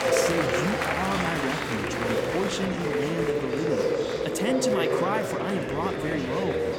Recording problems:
murmuring crowd; very loud; throughout; 4 dB above the speech

